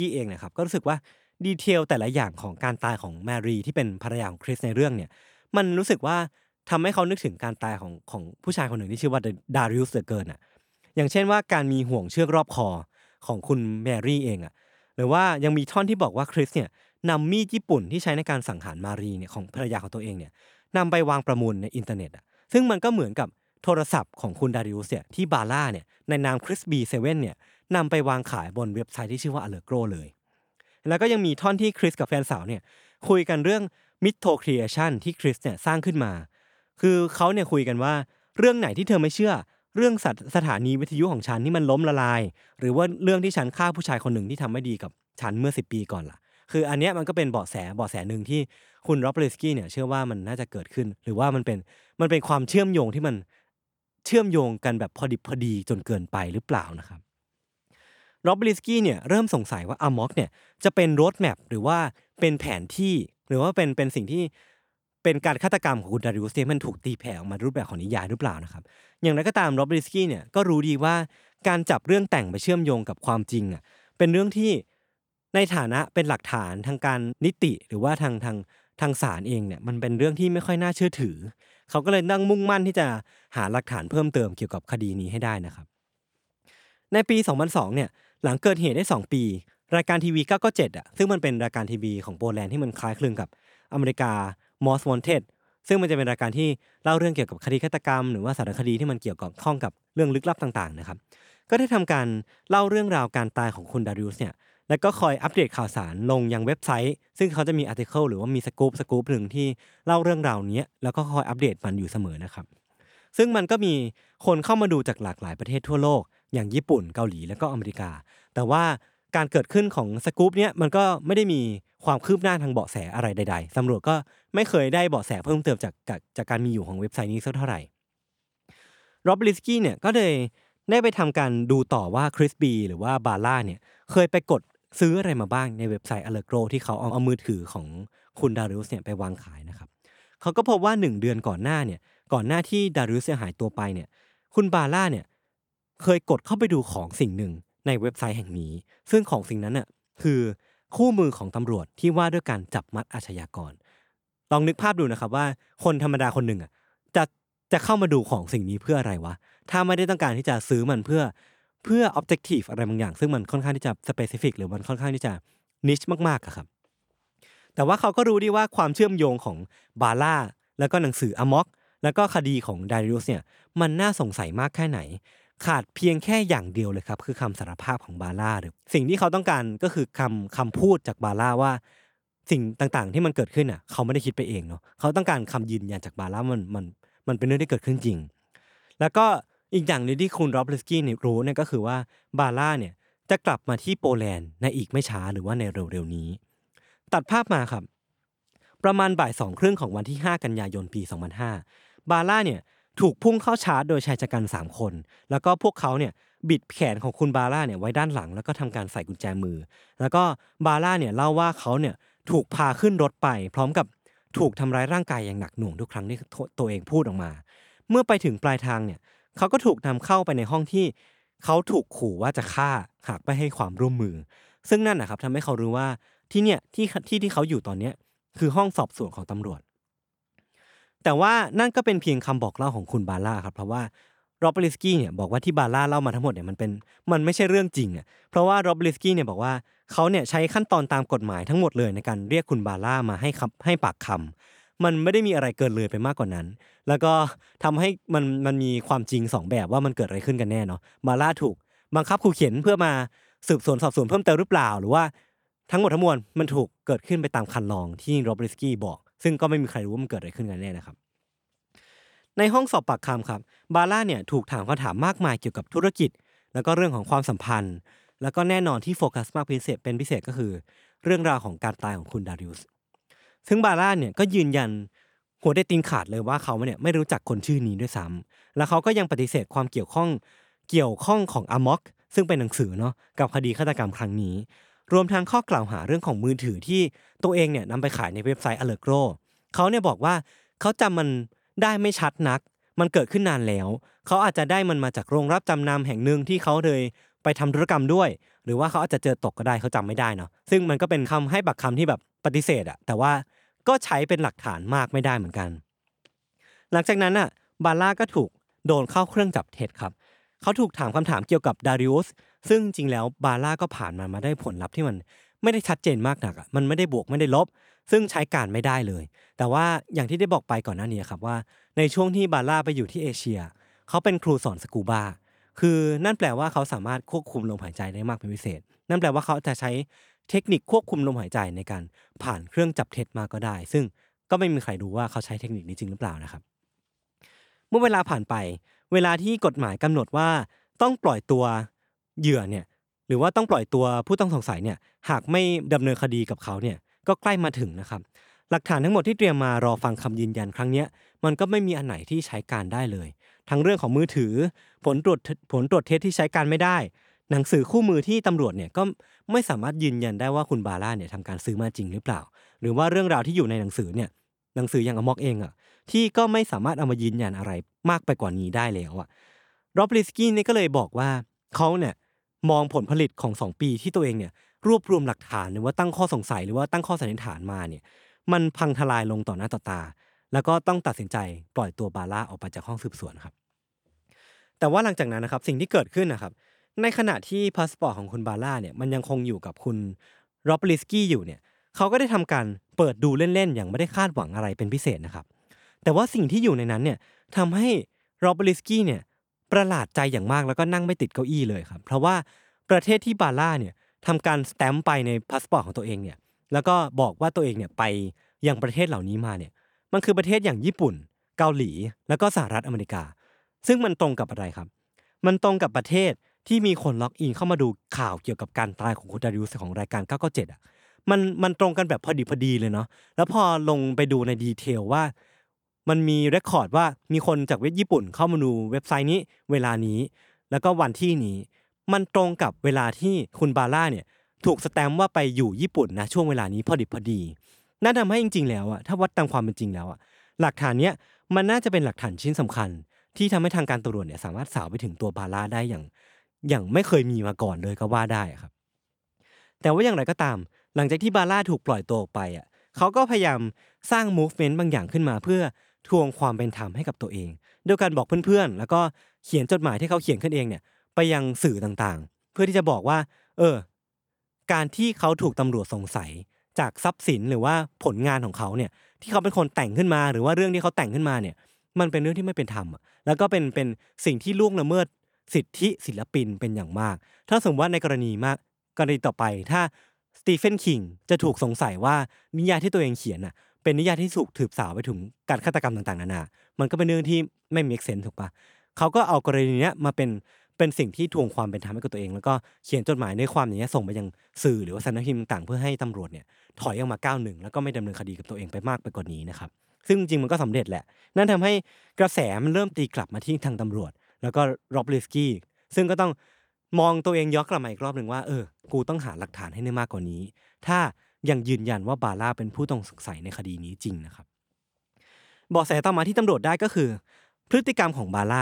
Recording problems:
abrupt cut into speech; at the start and the end

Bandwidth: 18.5 kHz